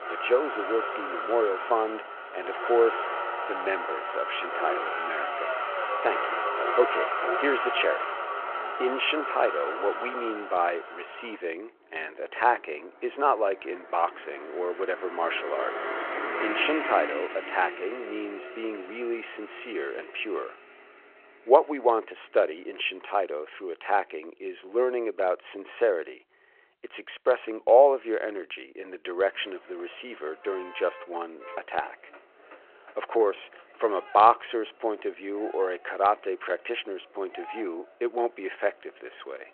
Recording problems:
phone-call audio
traffic noise; loud; throughout; 4 dB below the speech

